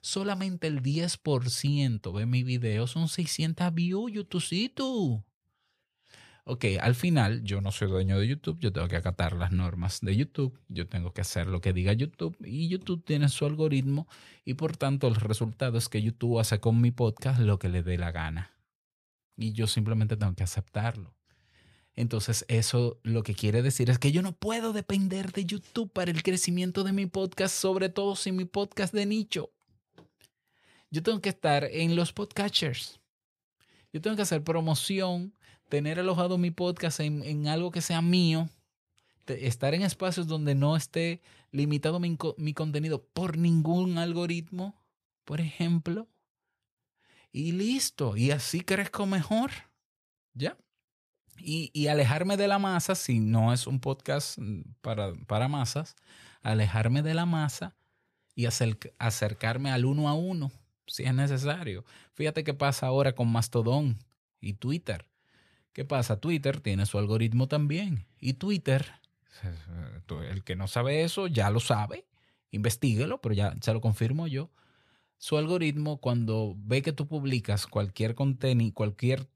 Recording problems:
uneven, jittery; slightly; from 2 s to 1:19

